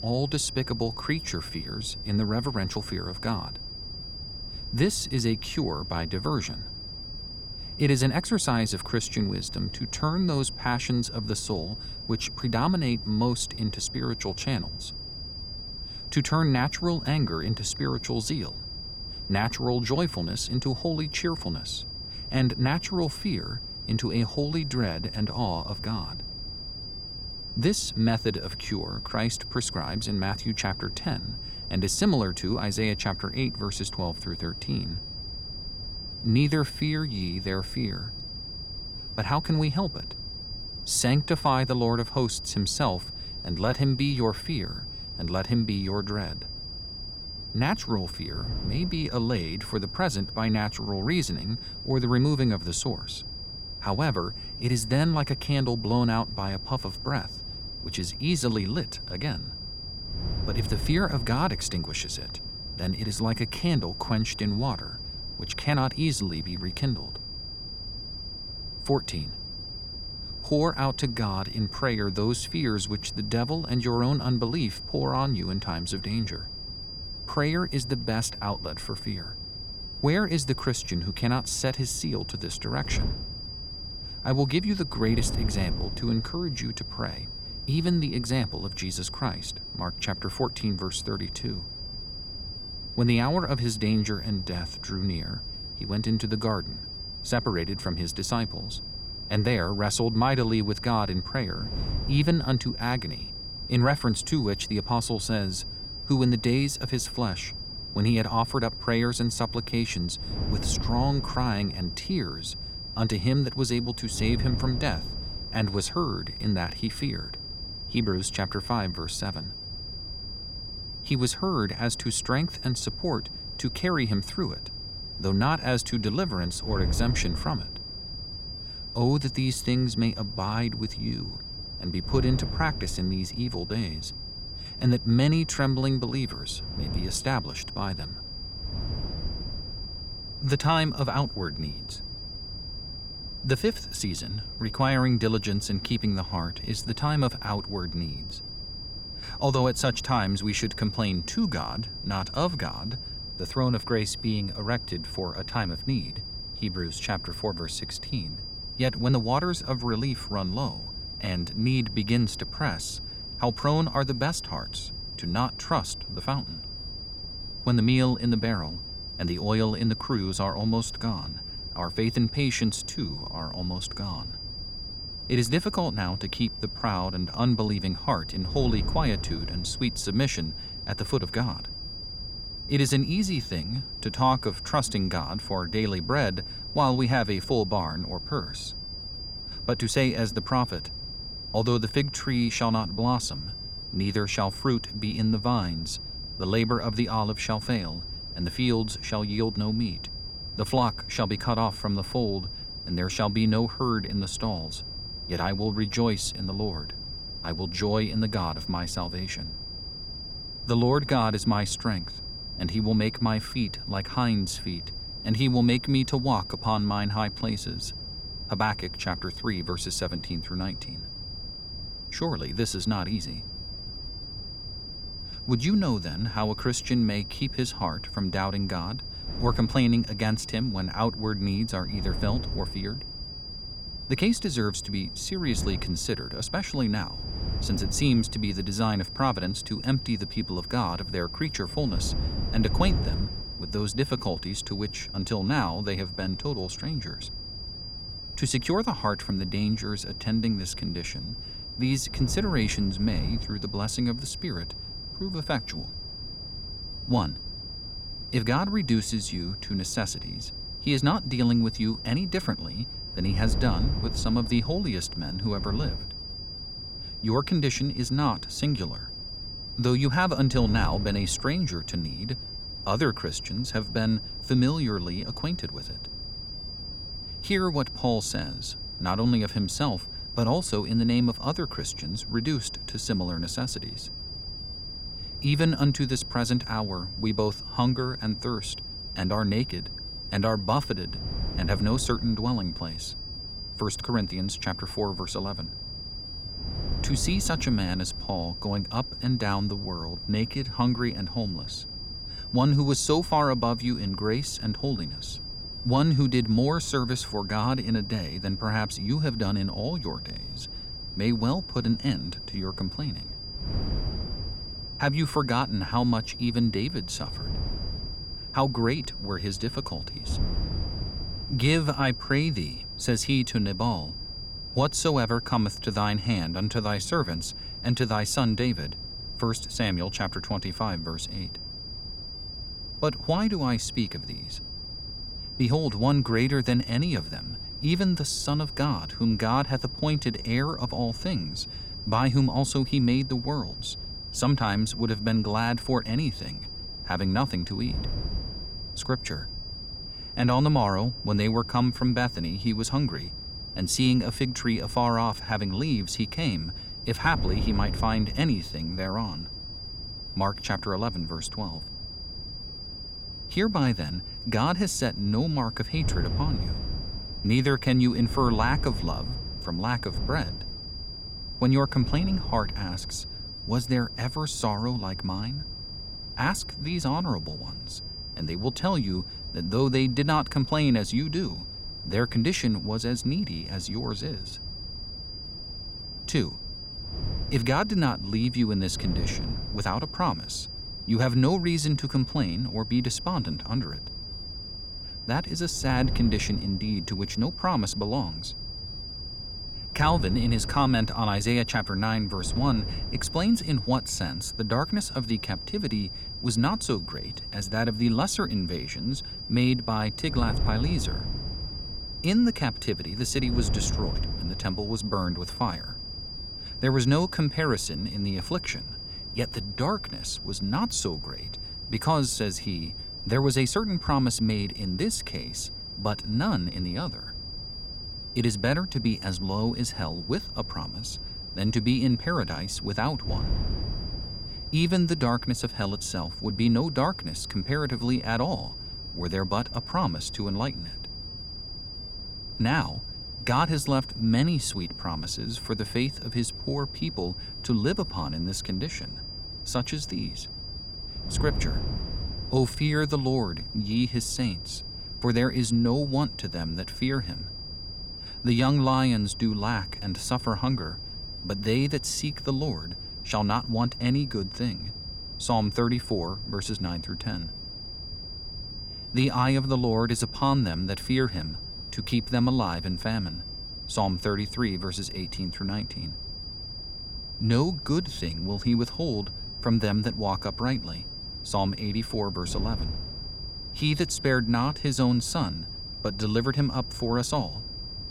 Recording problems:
high-pitched whine; loud; throughout; 5 kHz, 8 dB below the speech
wind noise on the microphone; occasional gusts; 20 dB below the speech

